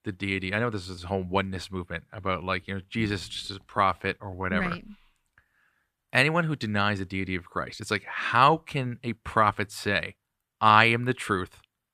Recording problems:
uneven, jittery; slightly; from 1 to 8.5 s

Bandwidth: 14.5 kHz